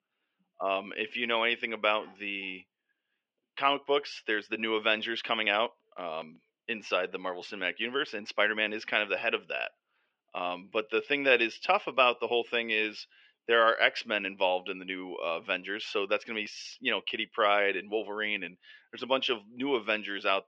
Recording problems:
muffled; slightly; fading above 3 kHz
thin; somewhat; fading below 450 Hz

